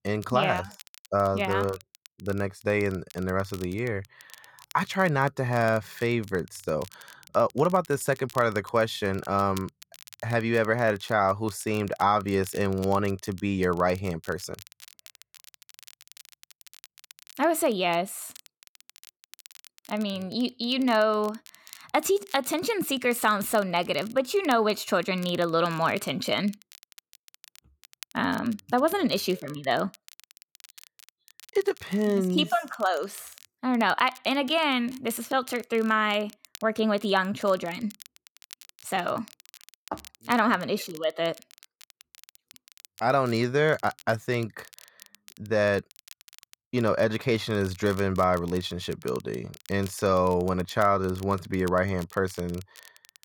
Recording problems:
crackle, like an old record; faint; 25 dB below the speech

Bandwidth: 17.5 kHz